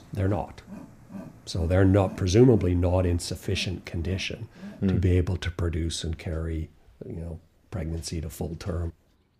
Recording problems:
animal sounds; noticeable; throughout; 20 dB below the speech

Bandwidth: 15 kHz